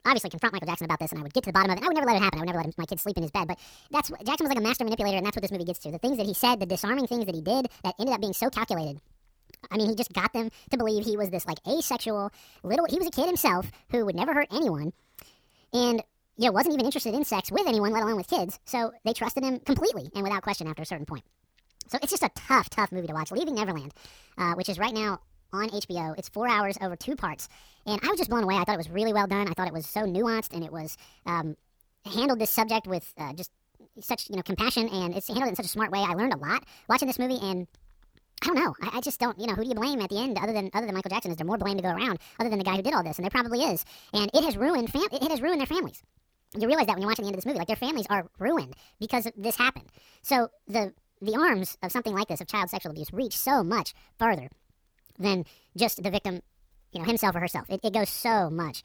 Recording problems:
wrong speed and pitch; too fast and too high; 1.6 times normal speed

